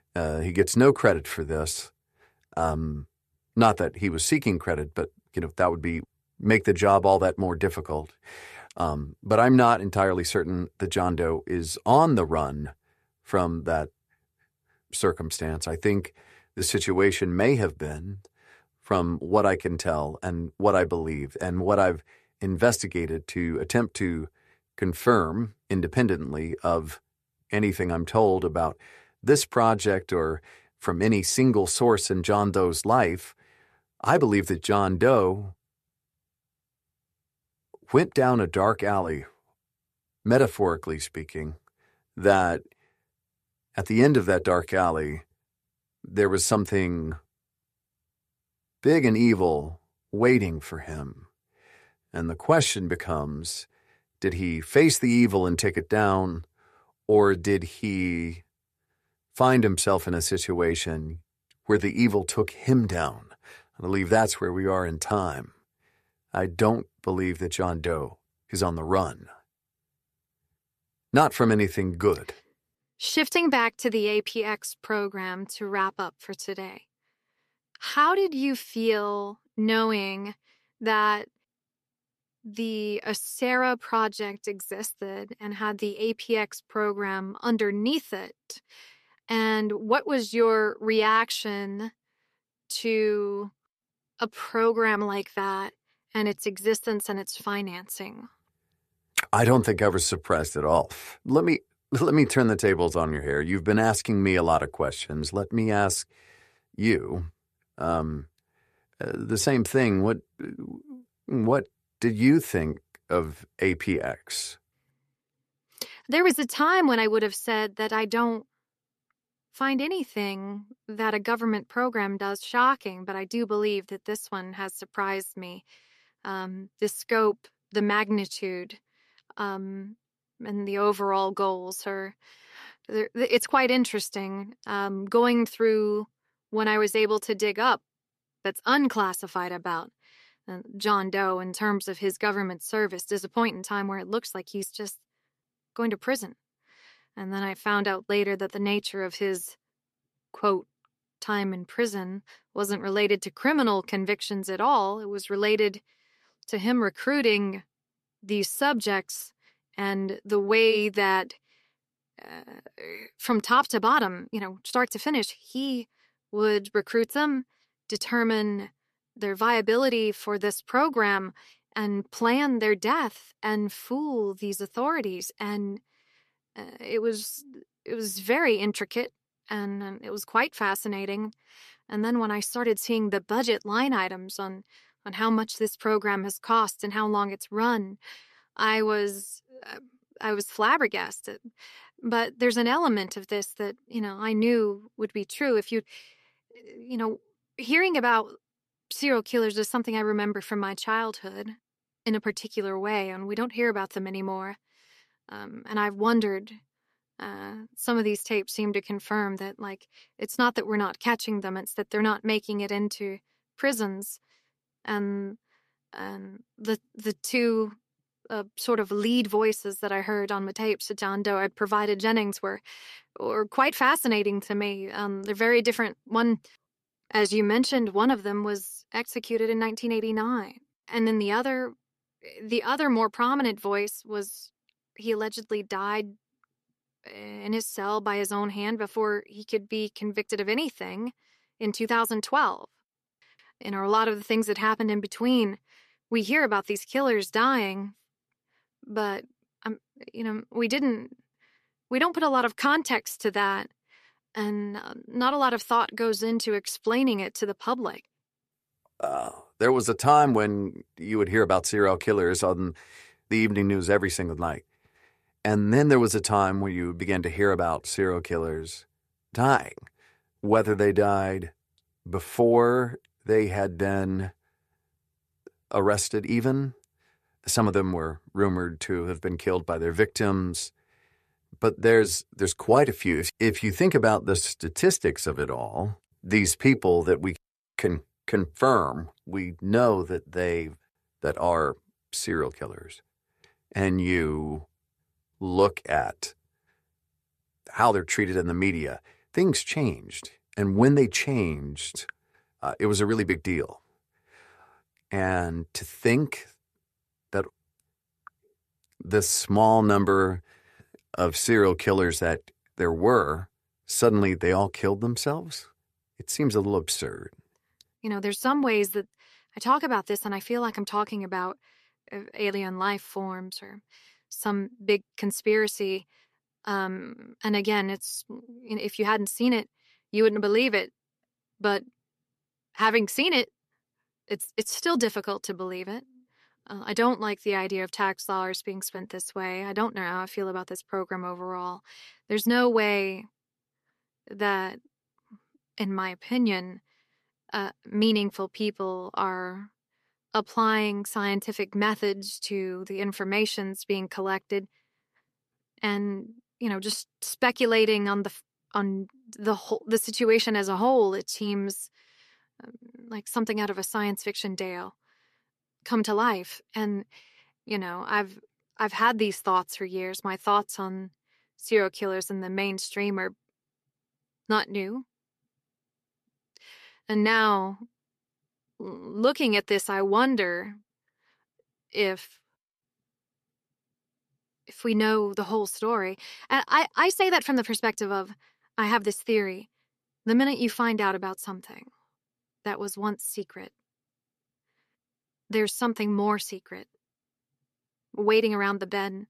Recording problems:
none

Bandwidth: 14 kHz